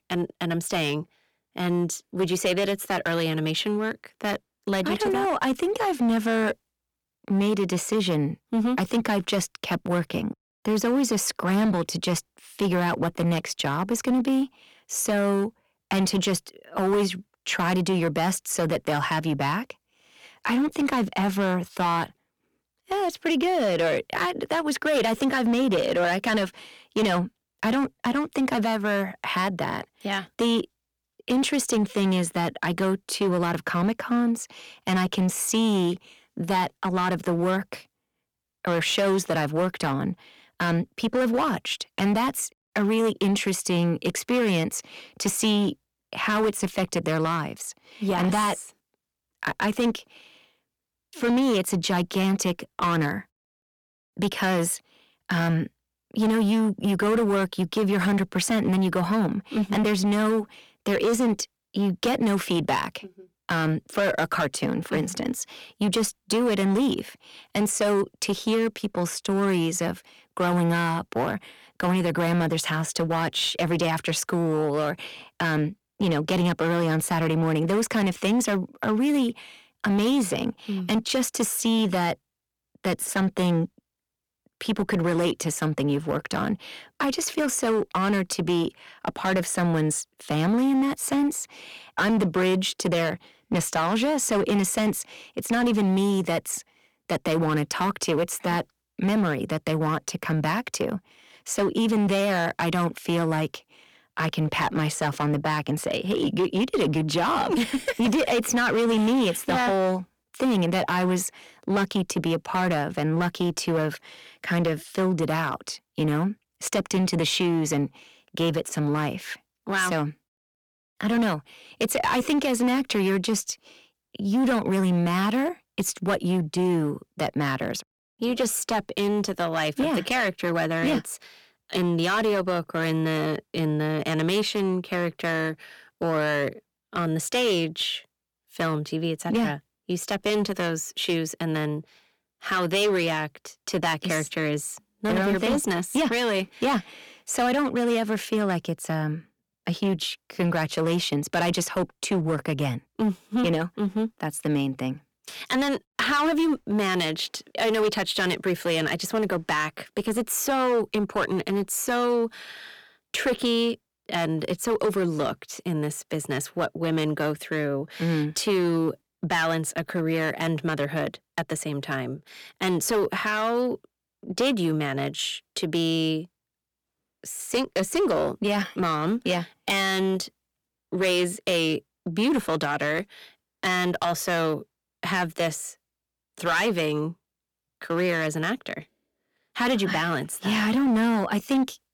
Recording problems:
distortion; slight; 11% of the sound clipped

